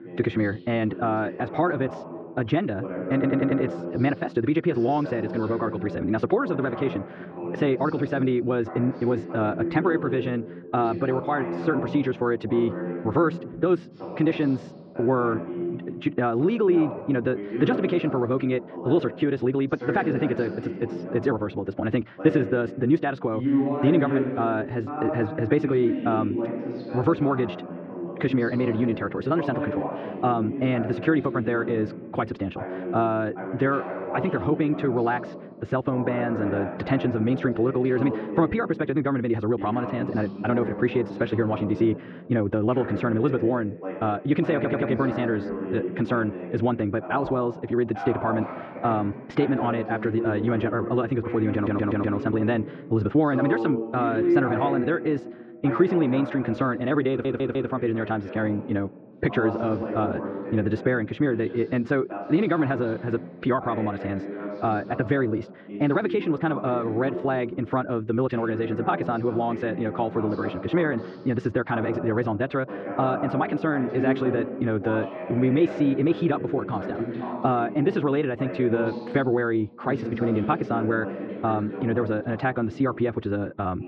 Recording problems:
muffled; very; fading above 2 kHz
wrong speed, natural pitch; too fast; 1.5 times normal speed
voice in the background; loud; throughout; 7 dB below the speech
audio stuttering; 4 times, first at 3 s

